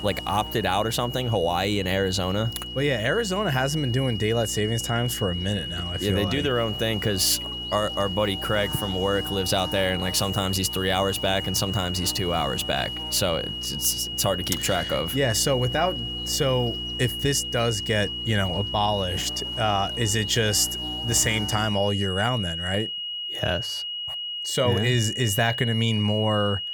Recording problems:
high-pitched whine; loud; throughout; 3 kHz, 5 dB below the speech
electrical hum; noticeable; until 22 s; 60 Hz, 20 dB below the speech

